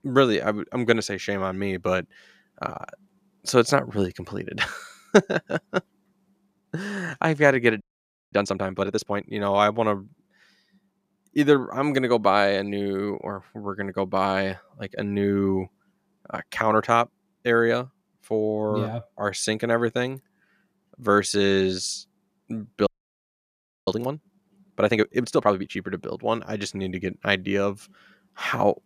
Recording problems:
audio freezing; at 8 s for 0.5 s and at 23 s for 1 s

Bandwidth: 14.5 kHz